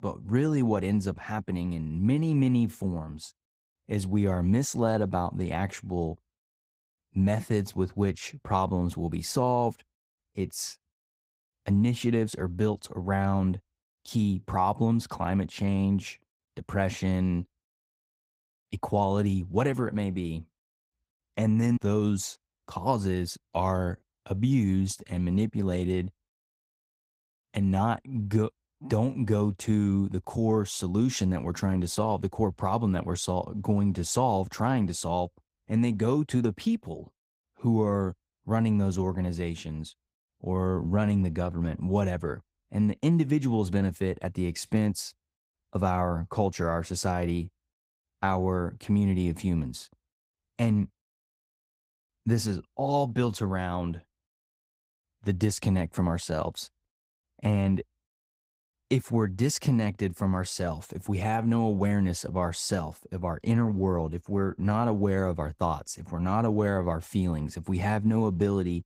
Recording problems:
garbled, watery; slightly; nothing above 15.5 kHz

